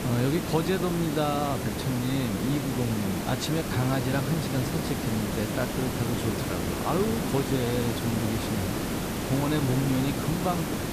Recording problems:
hiss; loud; throughout; 1 dB below the speech
chatter from many people; noticeable; throughout; 15 dB below the speech

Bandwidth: 14.5 kHz